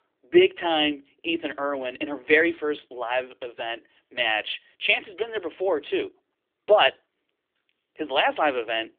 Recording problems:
thin; somewhat; fading below 300 Hz
phone-call audio; nothing above 3.5 kHz

